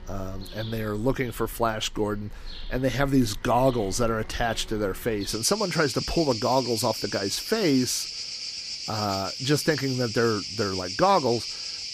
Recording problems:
animal sounds; loud; throughout; 7 dB below the speech

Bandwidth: 15 kHz